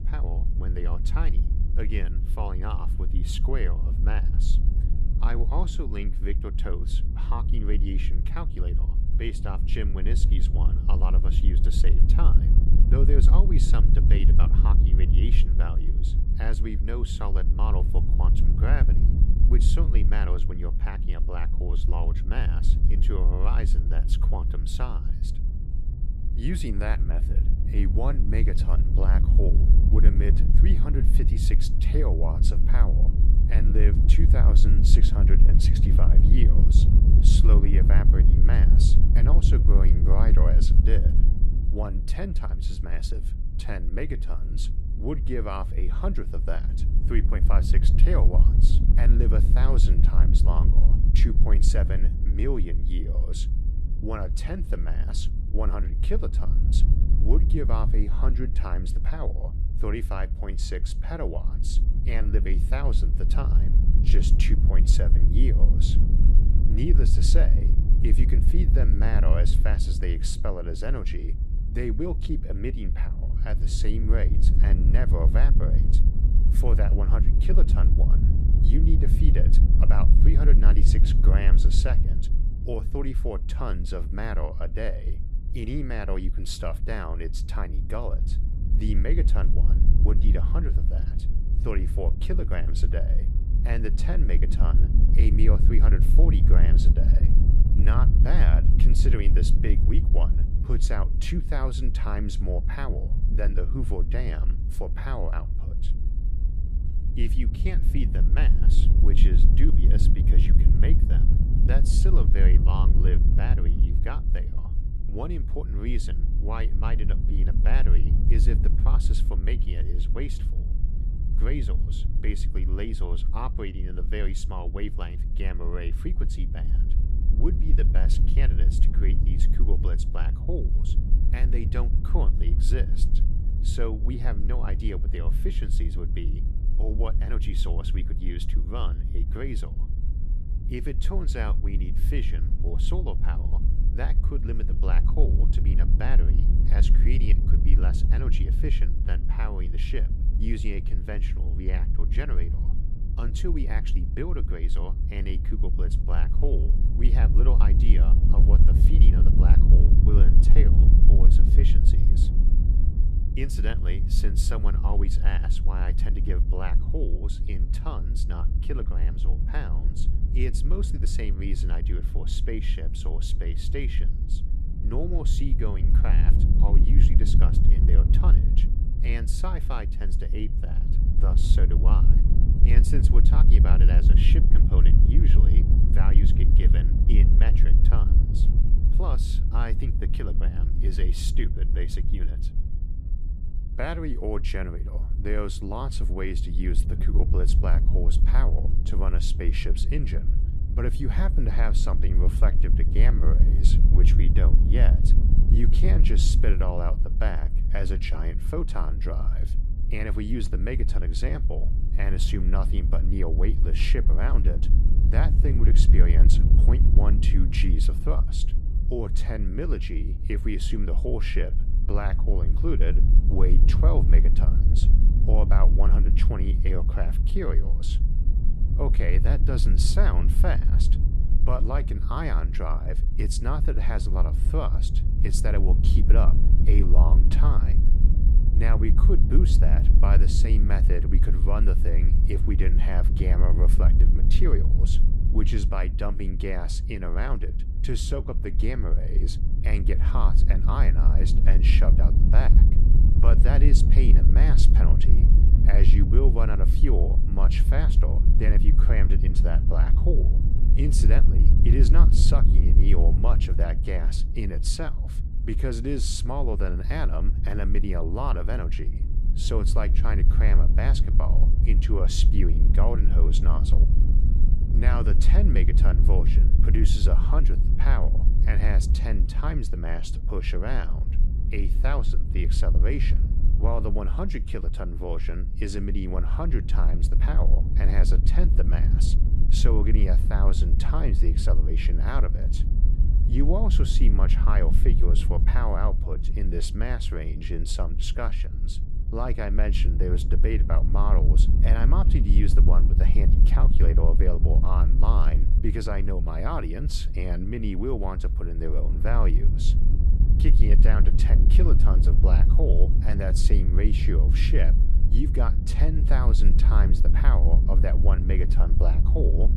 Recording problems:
wind noise on the microphone; heavy; 5 dB below the speech

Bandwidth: 14 kHz